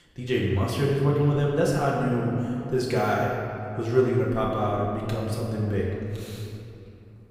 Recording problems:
off-mic speech; far
room echo; noticeable; dies away in 2.6 s

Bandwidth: 15.5 kHz